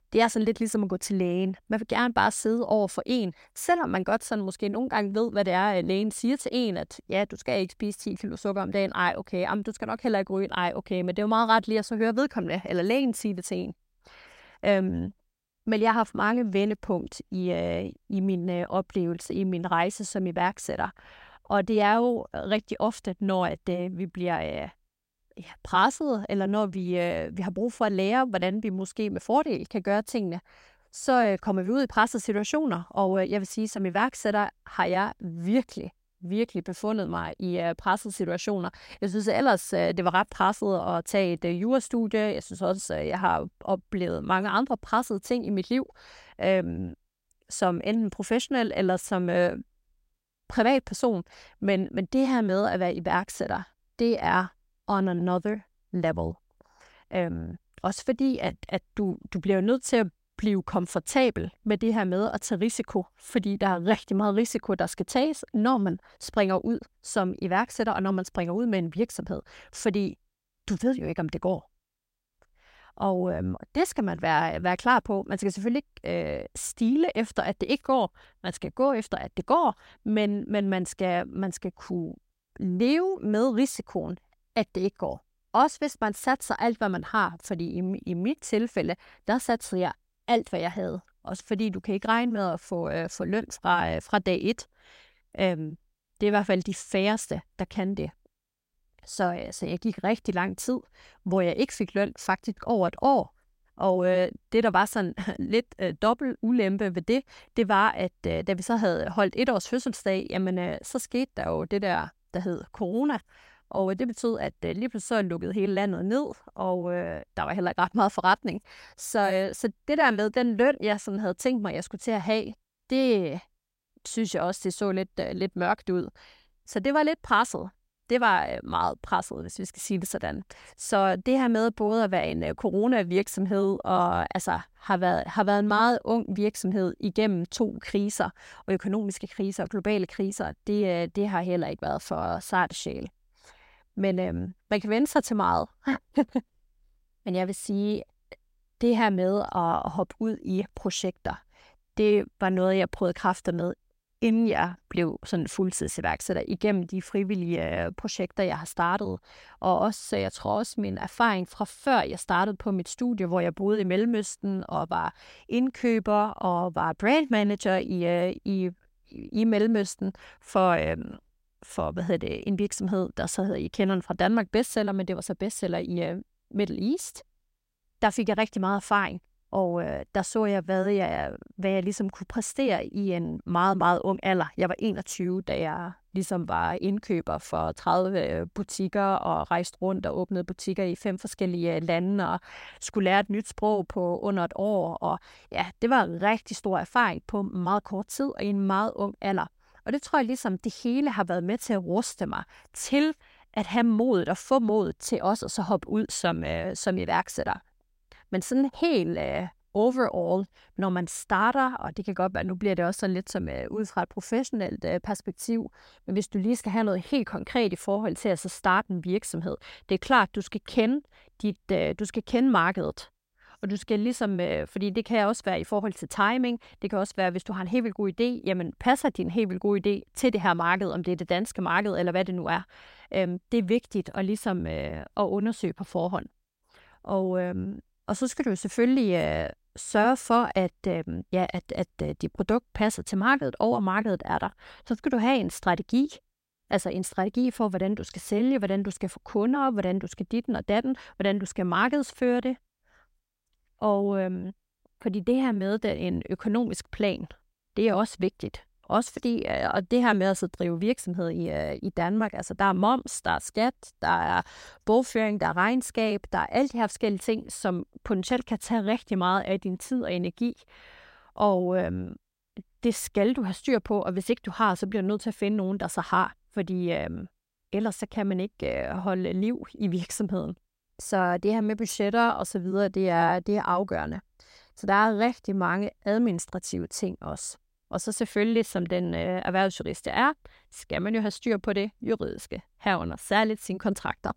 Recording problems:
none

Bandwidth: 16 kHz